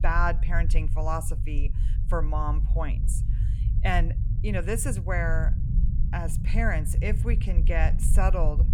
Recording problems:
low rumble; noticeable; throughout; 15 dB below the speech

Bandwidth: 18 kHz